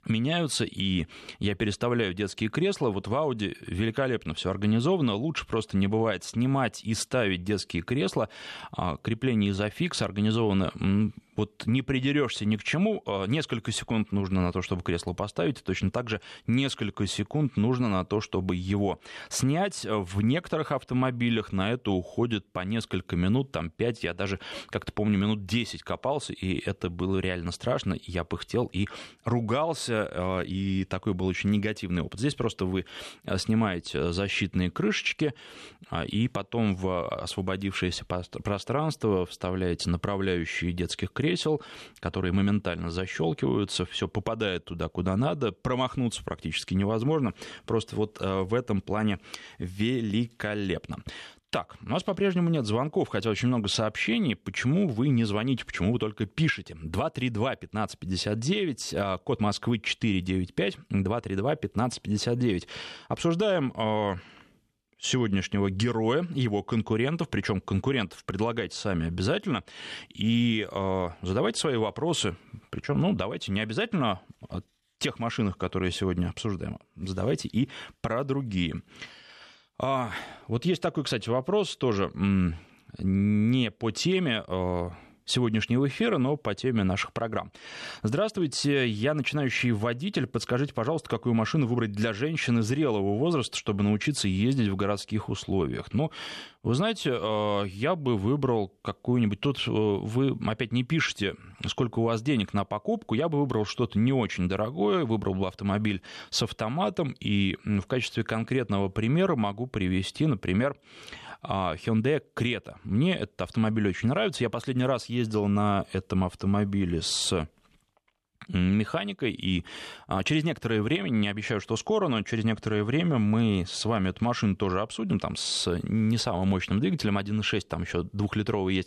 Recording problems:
none

